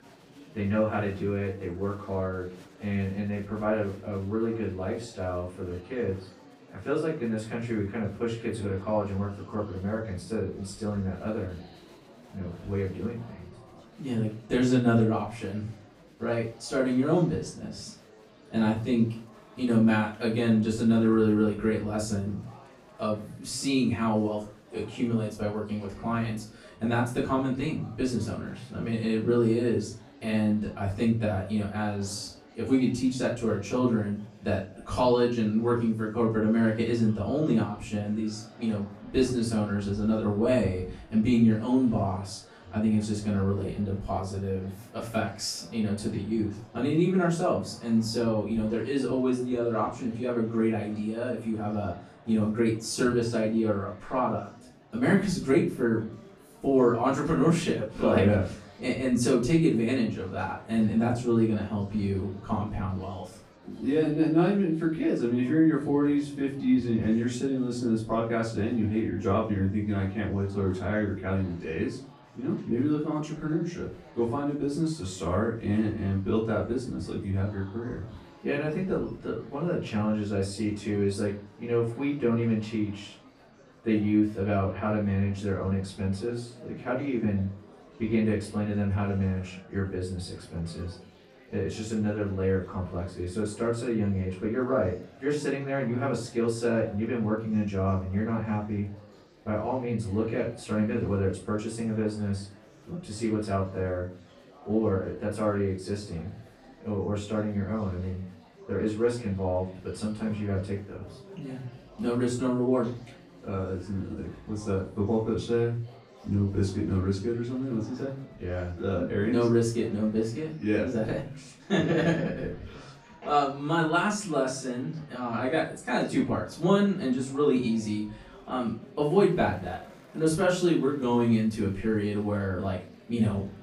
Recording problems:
off-mic speech; far
room echo; slight; dies away in 0.3 s
murmuring crowd; faint; throughout; 25 dB below the speech

